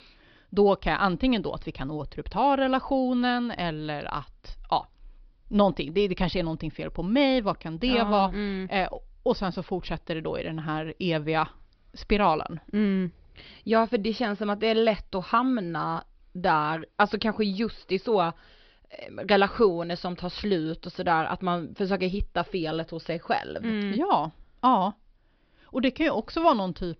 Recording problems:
high frequencies cut off; noticeable; nothing above 5.5 kHz

